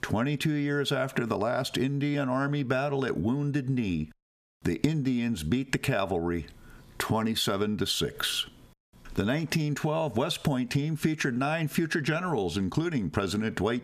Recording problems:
squashed, flat; somewhat

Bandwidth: 14.5 kHz